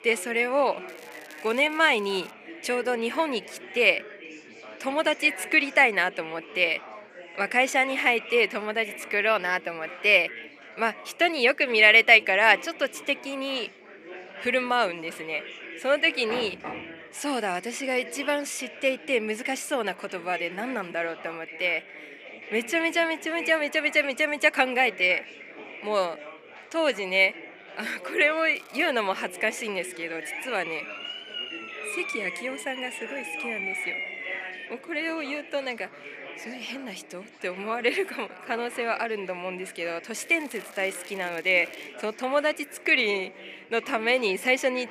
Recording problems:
thin; somewhat; fading below 350 Hz
chatter from many people; noticeable; throughout; 15 dB below the speech
crackling; faint; from 1 to 2.5 s, at 29 s and from 40 to 42 s; 25 dB below the speech
door banging; faint; at 16 s; peak 10 dB below the speech
siren; noticeable; from 30 to 35 s; peak 4 dB below the speech

